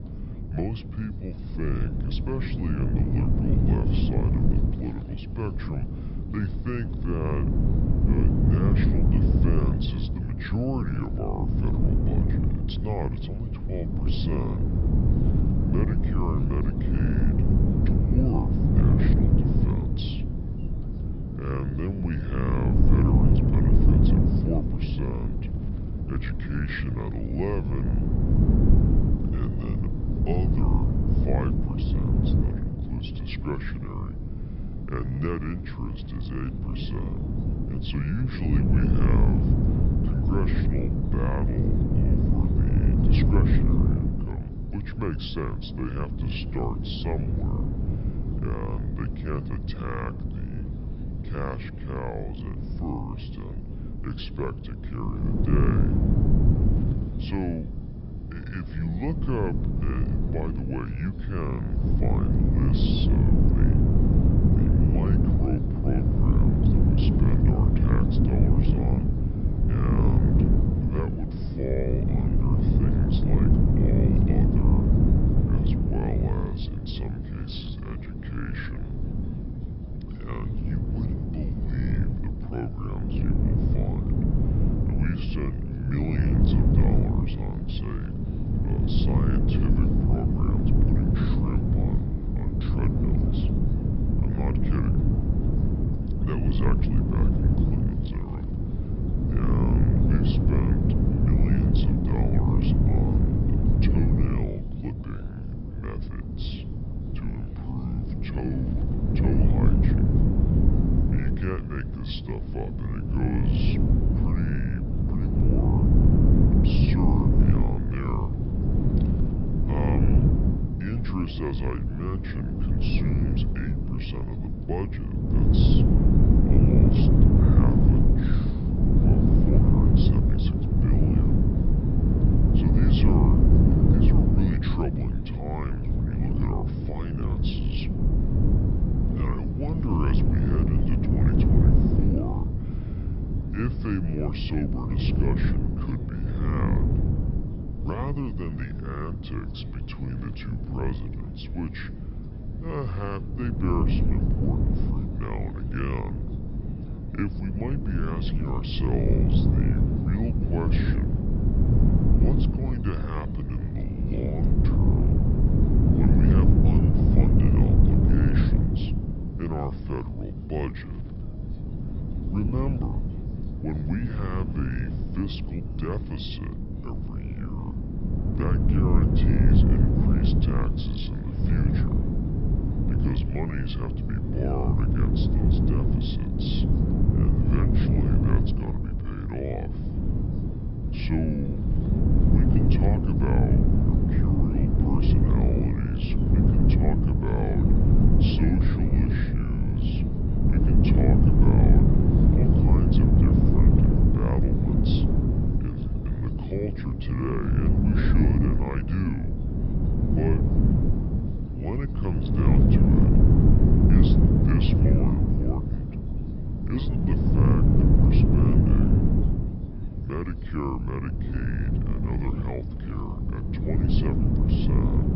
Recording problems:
wrong speed and pitch; too slow and too low; 0.7 times normal speed
high frequencies cut off; noticeable; nothing above 5.5 kHz
wind noise on the microphone; heavy; 3 dB above the speech
background chatter; faint; throughout; 2 voices, 25 dB below the speech
hiss; faint; throughout; 30 dB below the speech

